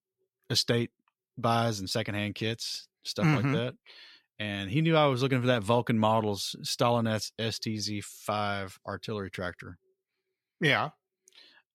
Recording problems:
none

